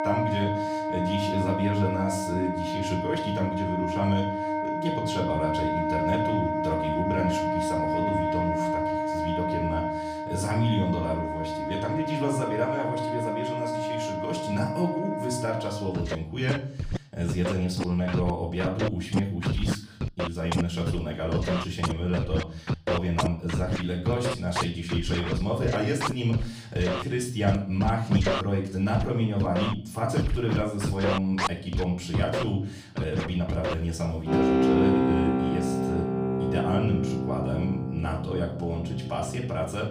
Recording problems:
off-mic speech; far
room echo; slight; dies away in 0.5 s
background music; loud; throughout; as loud as the speech

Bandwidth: 15 kHz